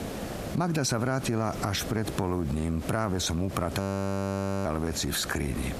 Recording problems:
squashed, flat; heavily
hiss; noticeable; throughout; 10 dB below the speech
audio freezing; at 4 s for 1 s

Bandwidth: 14.5 kHz